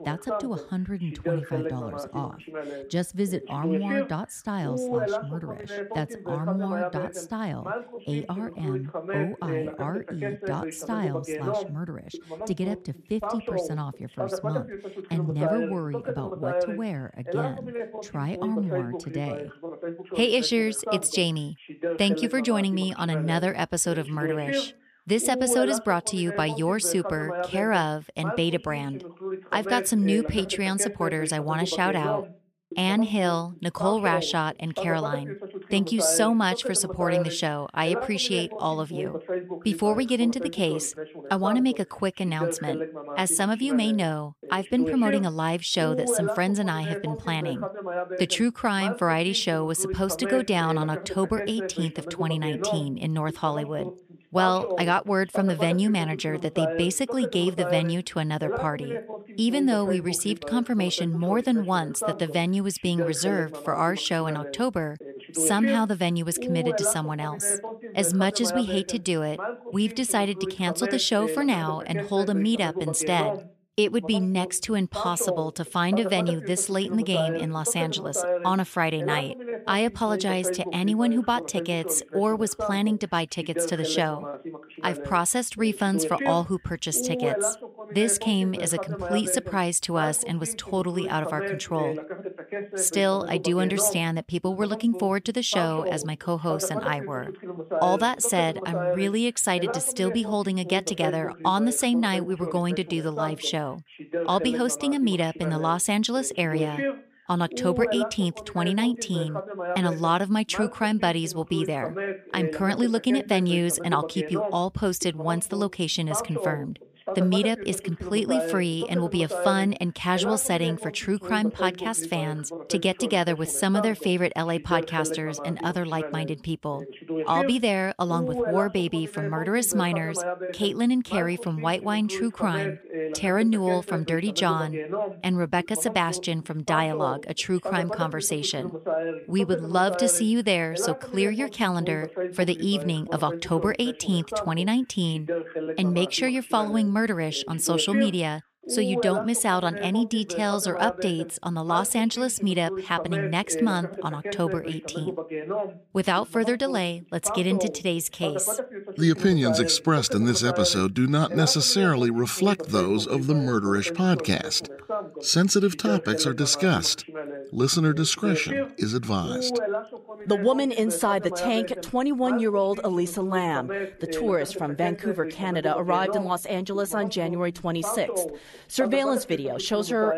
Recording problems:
voice in the background; loud; throughout; 7 dB below the speech

